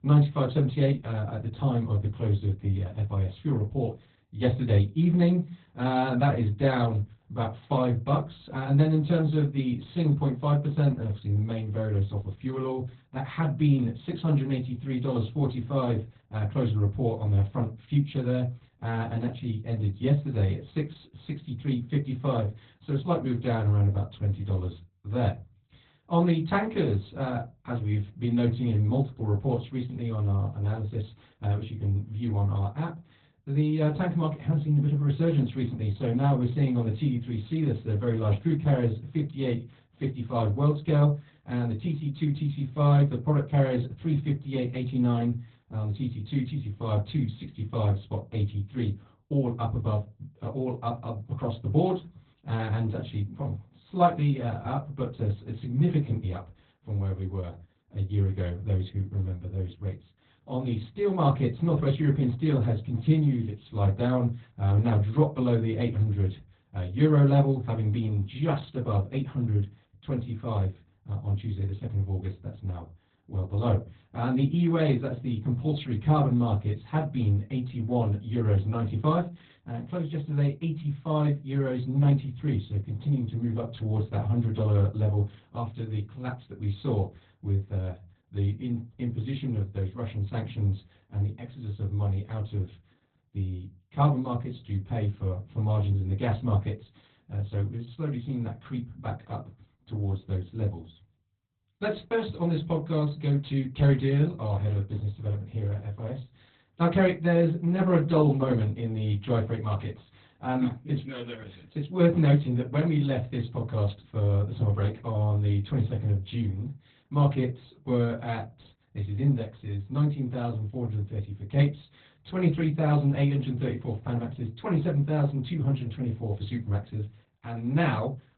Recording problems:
off-mic speech; far
garbled, watery; badly; nothing above 4 kHz
room echo; very slight; dies away in 0.2 s

